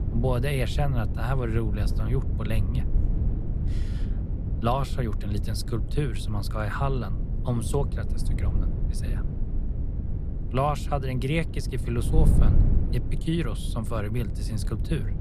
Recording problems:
wind noise on the microphone; occasional gusts; 10 dB below the speech

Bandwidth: 14.5 kHz